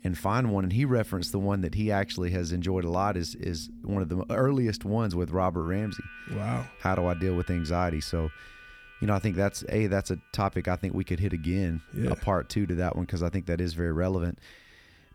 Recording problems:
background music; noticeable; throughout; 20 dB below the speech

